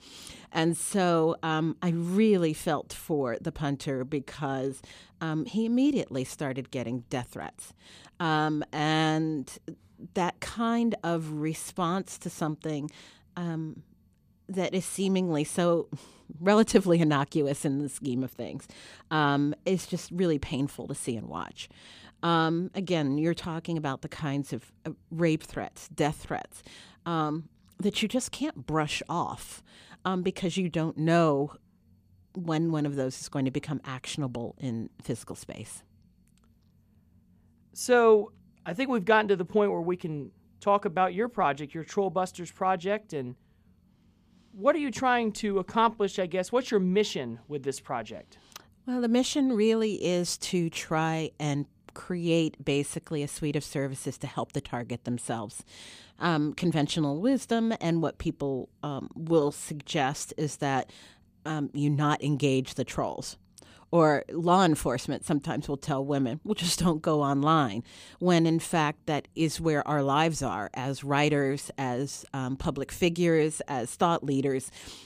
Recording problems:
none

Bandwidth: 15 kHz